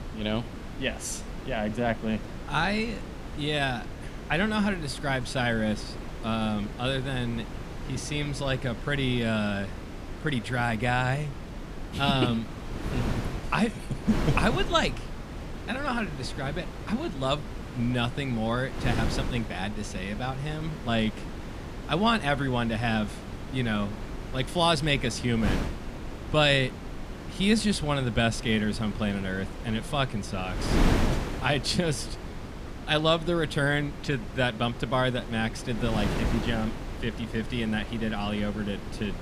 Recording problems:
wind noise on the microphone; occasional gusts; 10 dB below the speech

